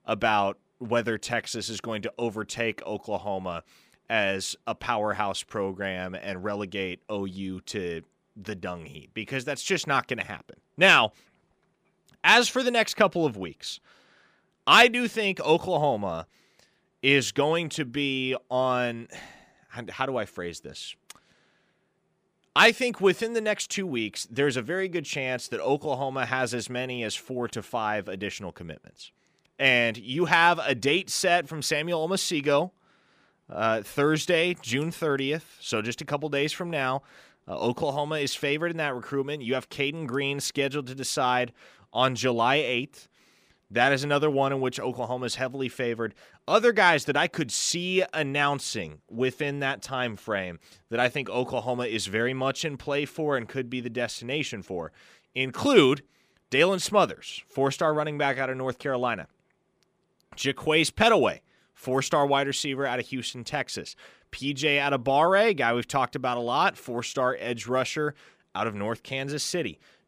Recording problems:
none

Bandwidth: 15 kHz